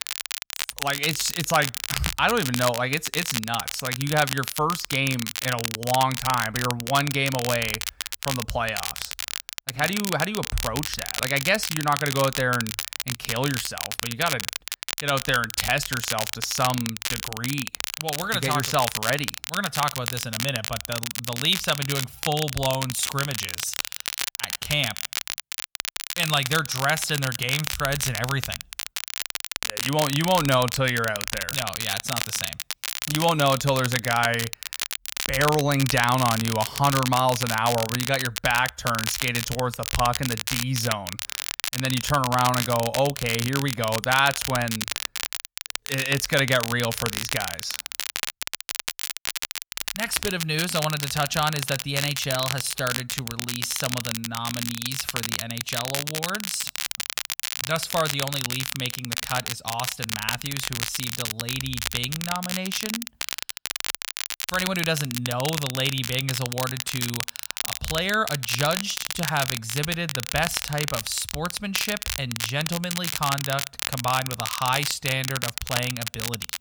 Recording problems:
crackle, like an old record; loud; 3 dB below the speech

